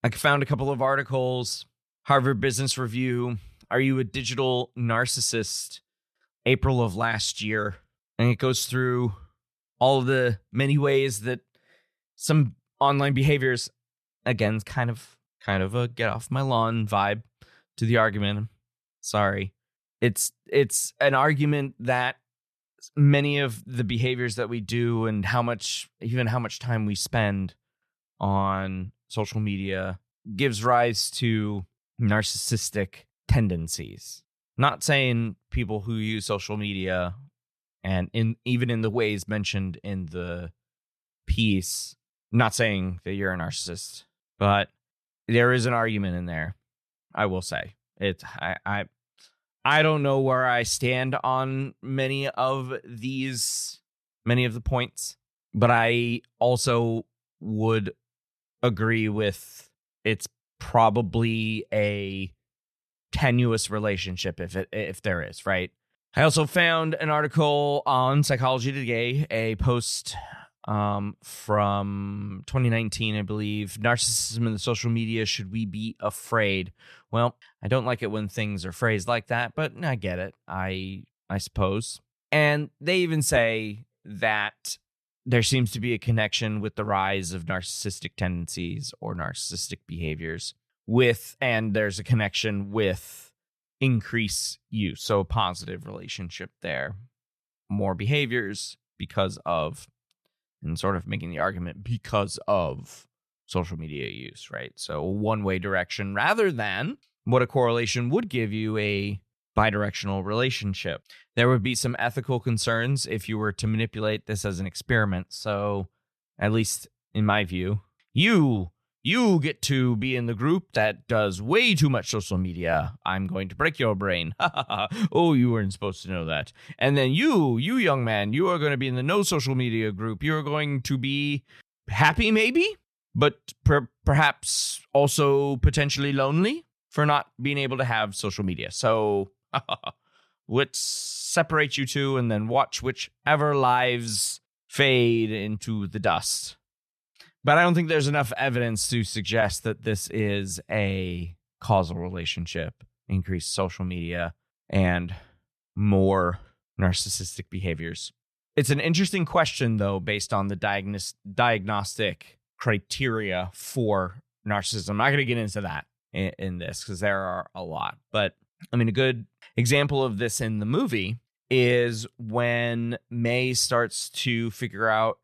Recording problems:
none

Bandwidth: 13.5 kHz